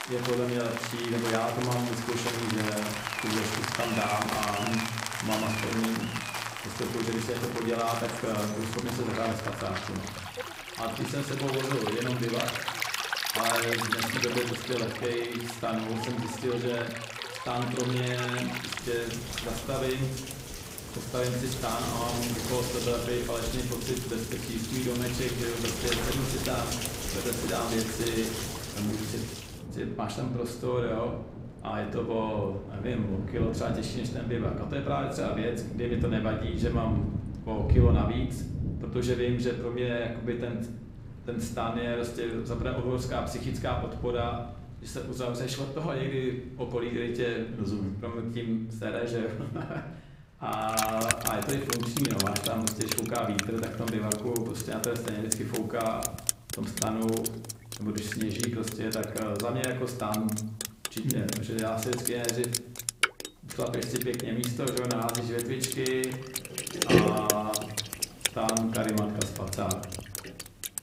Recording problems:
room echo; slight; dies away in 0.7 s
off-mic speech; somewhat distant
rain or running water; loud; throughout; 2 dB below the speech

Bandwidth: 15.5 kHz